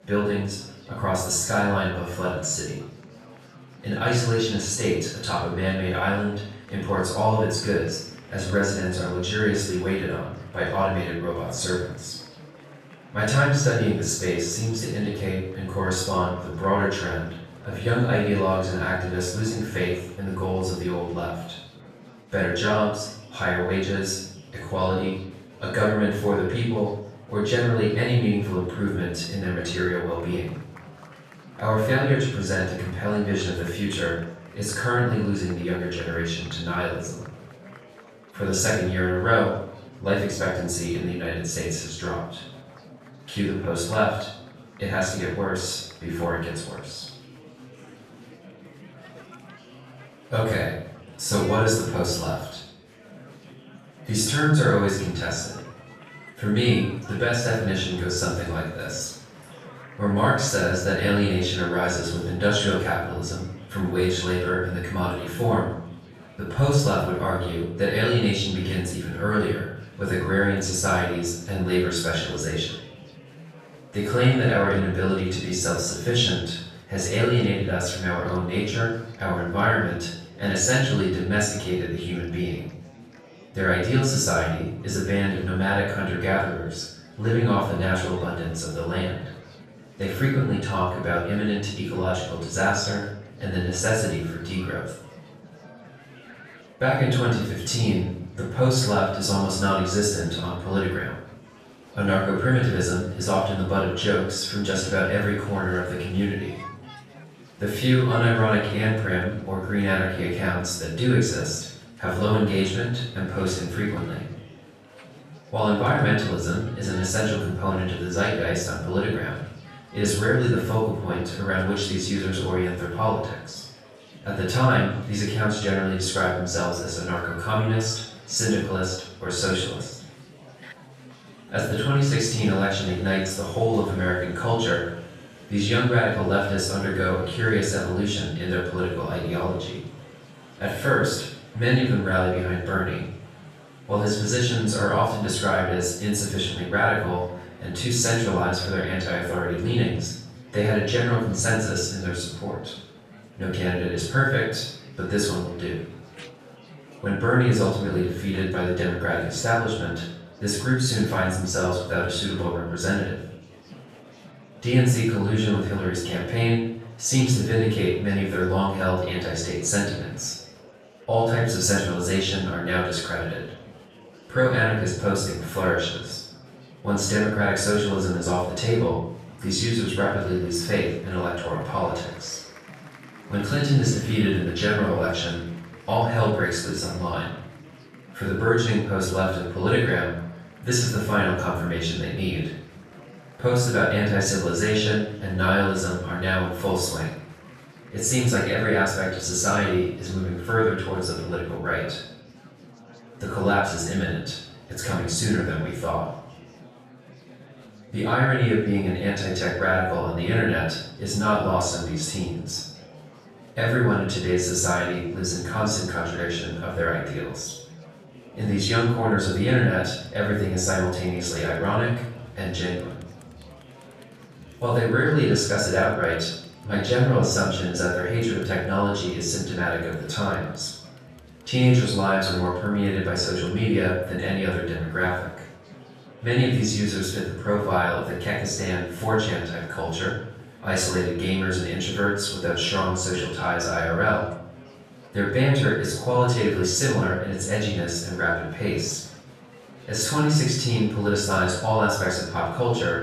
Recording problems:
off-mic speech; far
room echo; noticeable; dies away in 0.6 s
chatter from many people; faint; throughout; 20 dB below the speech

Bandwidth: 14 kHz